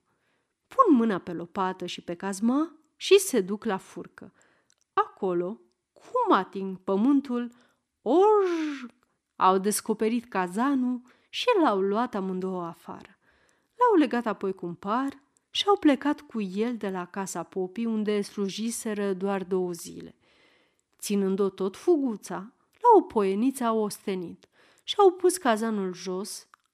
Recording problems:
none

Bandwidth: 14 kHz